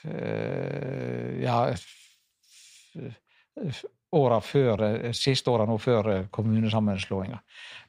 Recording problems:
uneven, jittery; strongly; from 0.5 to 7.5 s

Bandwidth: 15 kHz